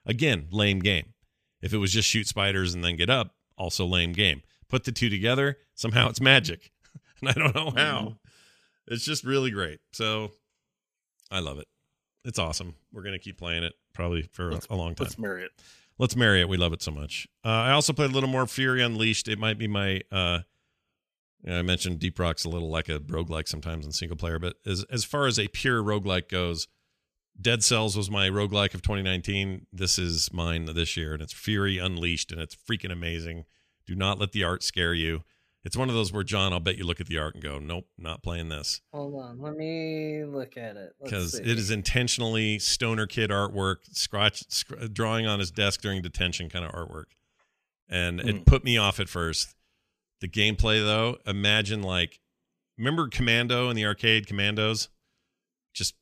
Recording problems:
none

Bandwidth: 14.5 kHz